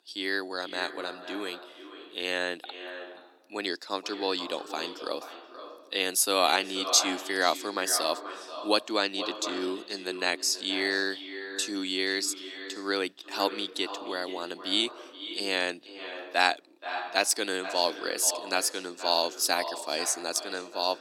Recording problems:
echo of what is said; strong; throughout; 480 ms later, 10 dB below the speech
thin; very; fading below 300 Hz

